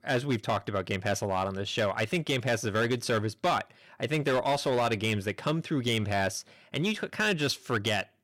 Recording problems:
distortion; slight; 7% of the sound clipped

